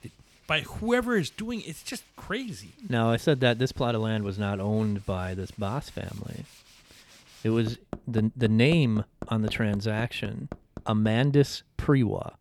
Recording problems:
machinery noise; noticeable; throughout; 20 dB below the speech

